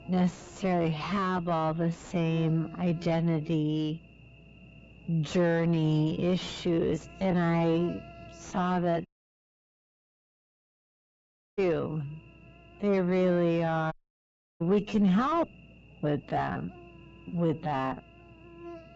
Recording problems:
distortion; heavy; 5 dB below the speech
wrong speed, natural pitch; too slow; 0.6 times normal speed
high frequencies cut off; noticeable; nothing above 8 kHz
electrical hum; faint; throughout; 60 Hz, 20 dB below the speech
audio cutting out; at 9 s for 2.5 s and at 14 s for 0.5 s

